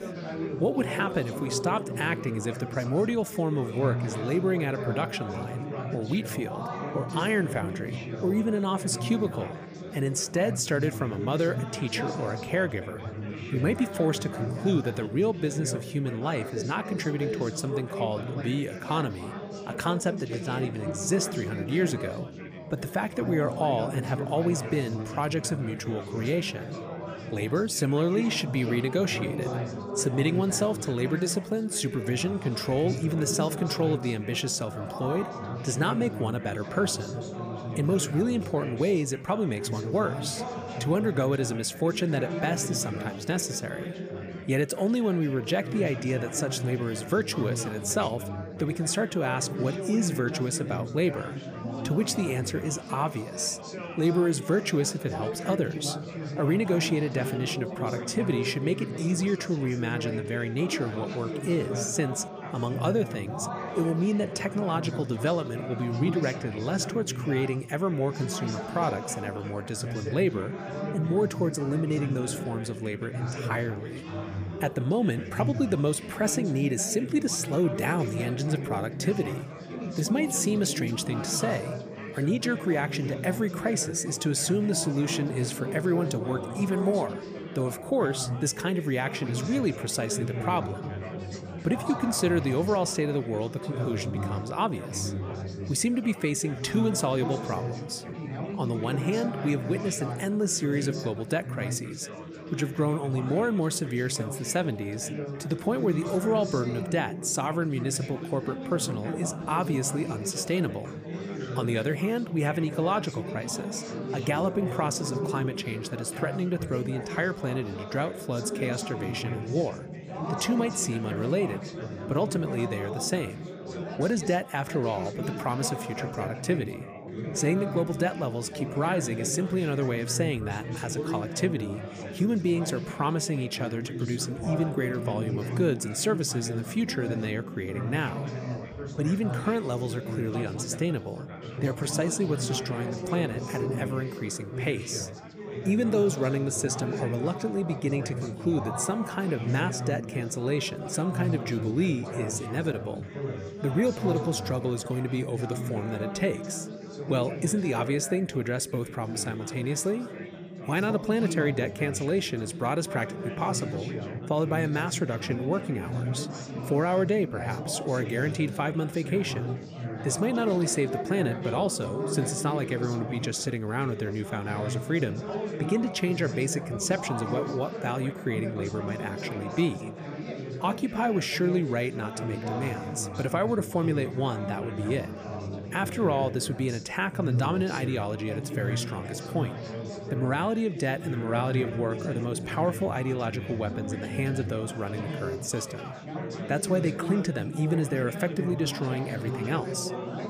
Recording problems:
chatter from many people; loud; throughout; 6 dB below the speech

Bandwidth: 15 kHz